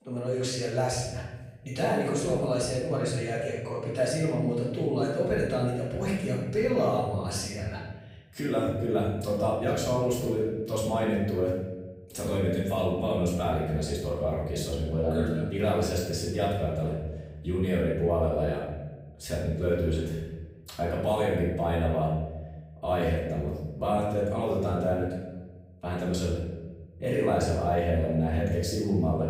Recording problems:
off-mic speech; far
room echo; noticeable; dies away in 1.1 s

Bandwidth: 15.5 kHz